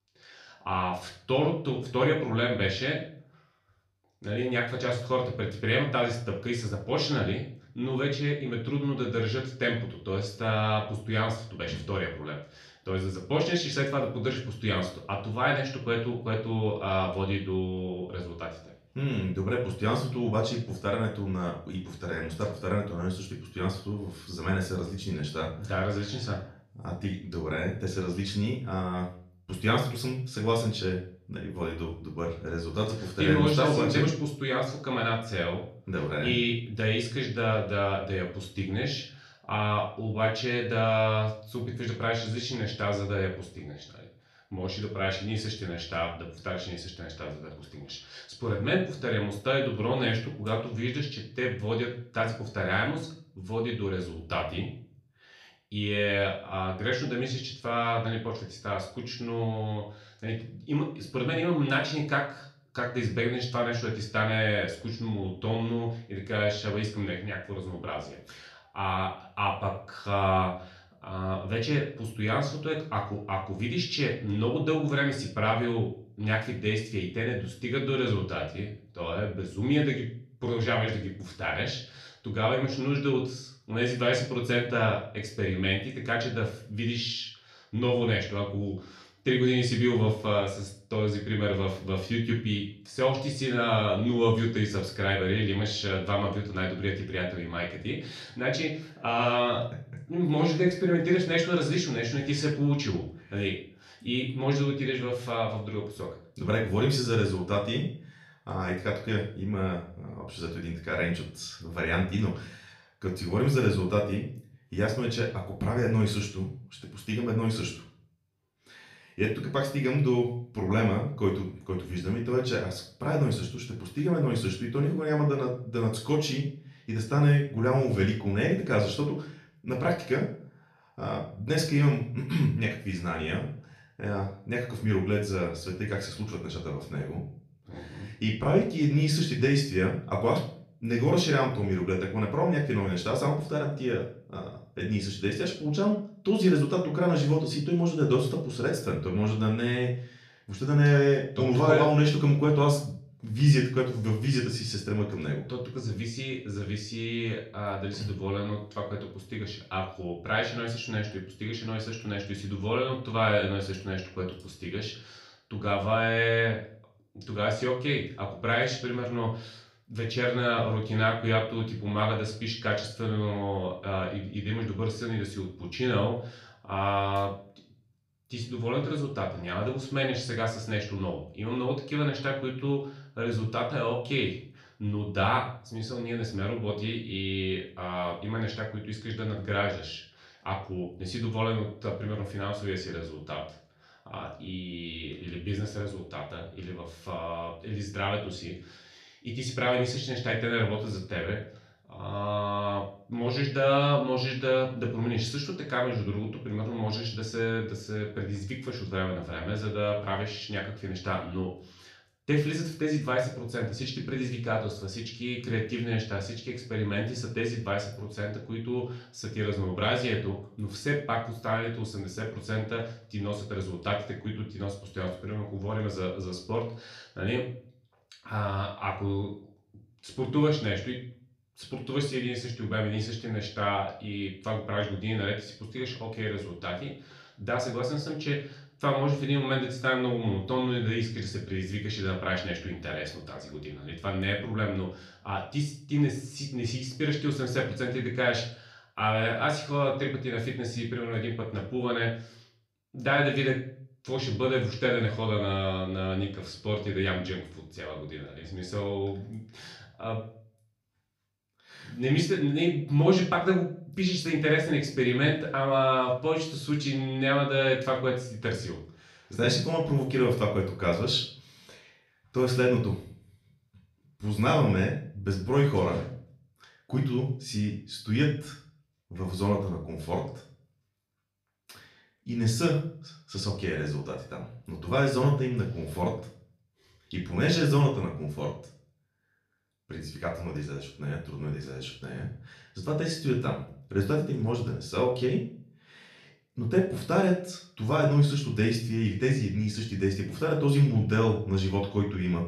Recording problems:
off-mic speech; far
room echo; slight; dies away in 0.4 s

